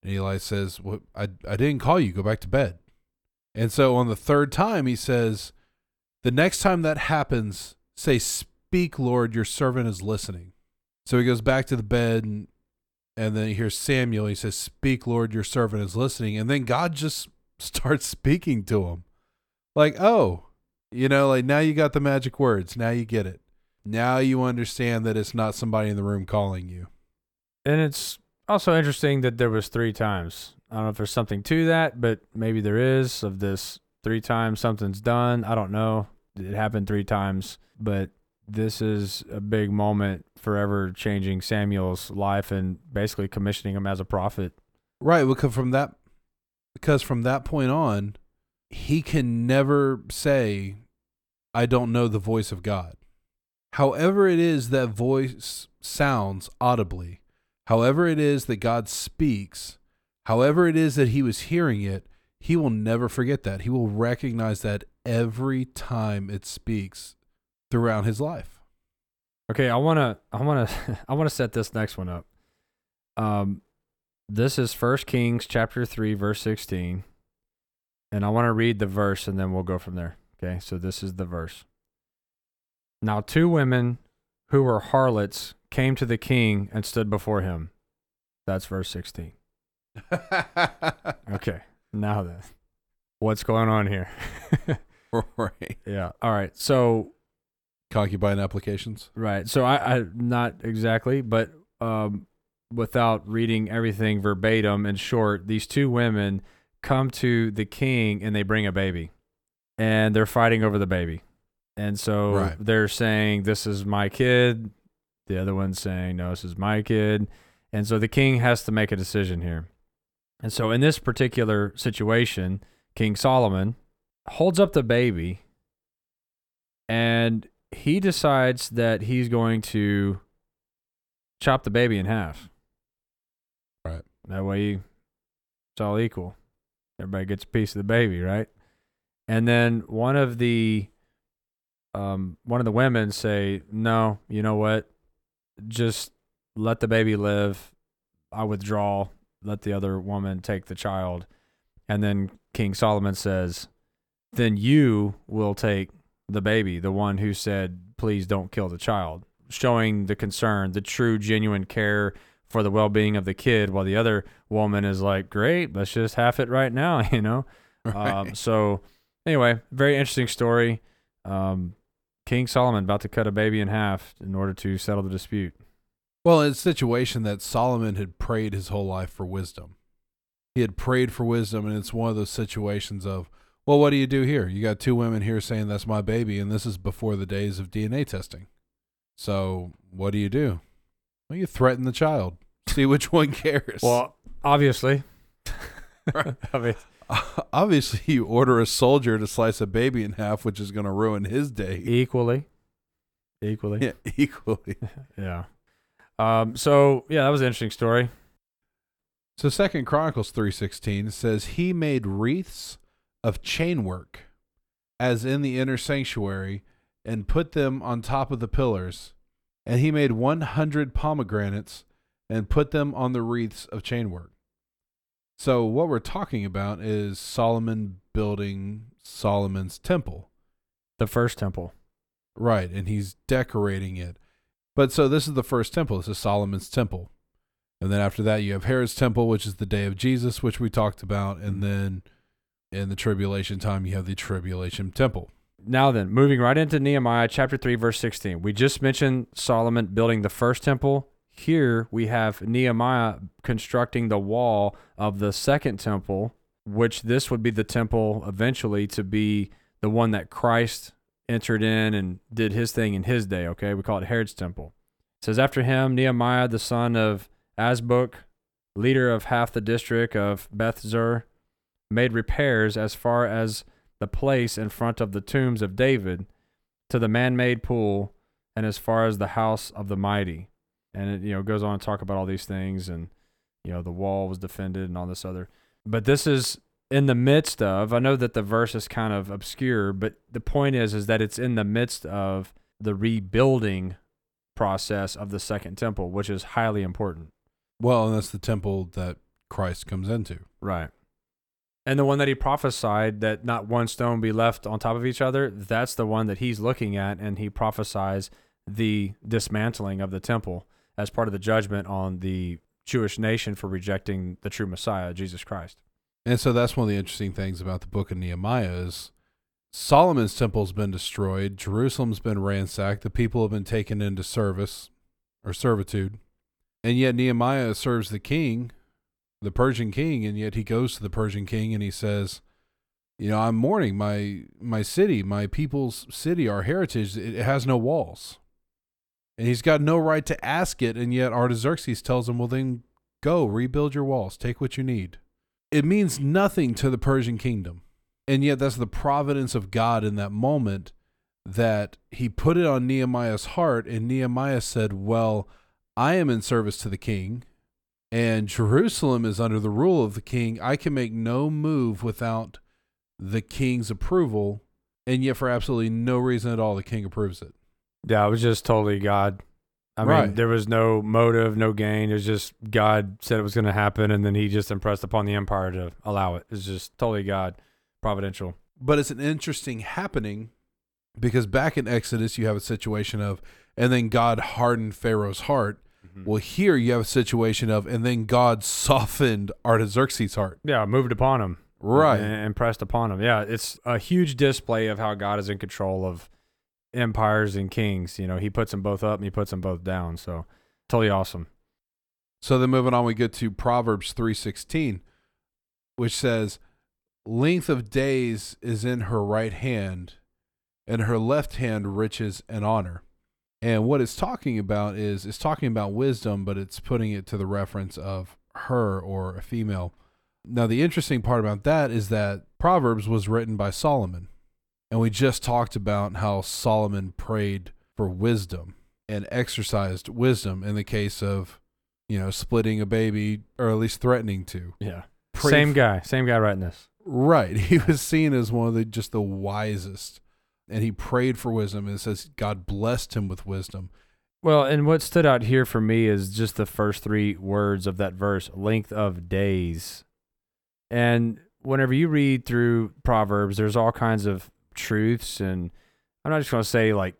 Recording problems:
none

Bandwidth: 18.5 kHz